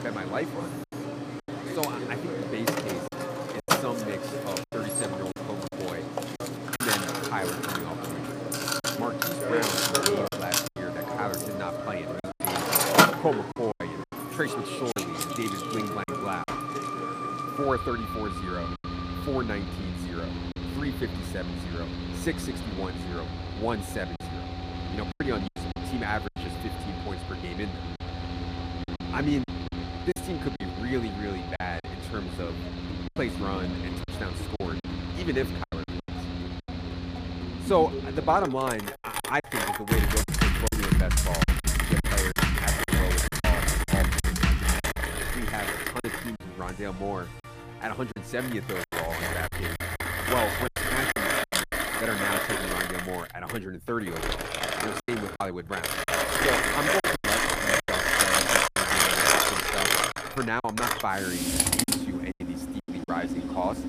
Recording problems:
machinery noise; very loud; throughout; 4 dB above the speech
background music; very loud; until 51 s; as loud as the speech
choppy; very; 6% of the speech affected

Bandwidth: 15 kHz